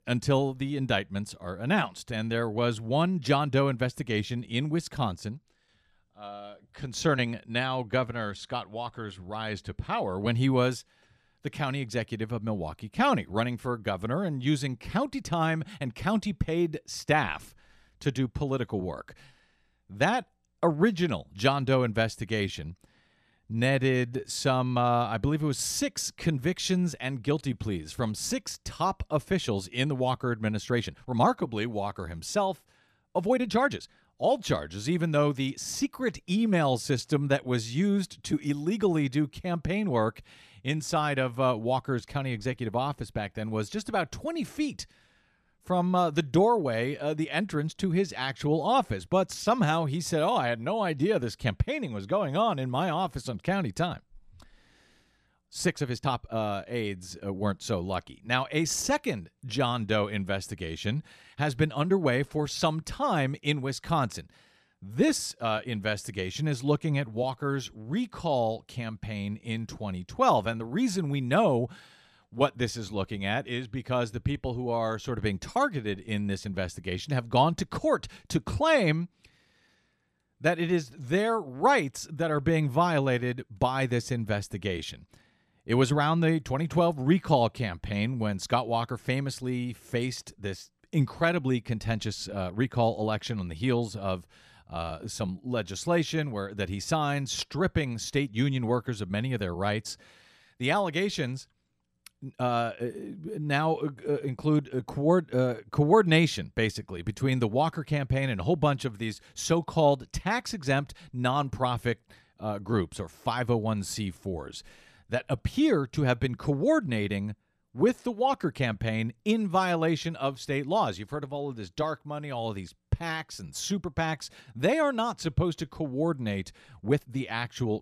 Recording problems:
uneven, jittery; strongly; from 23 s to 2:07

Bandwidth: 14 kHz